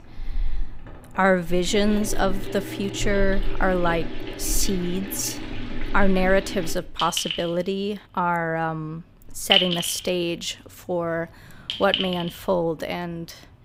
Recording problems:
household noises; loud; throughout; 4 dB below the speech

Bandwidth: 15.5 kHz